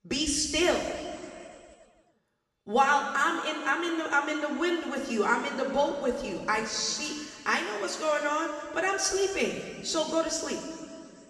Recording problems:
room echo; noticeable; dies away in 2.3 s
off-mic speech; somewhat distant

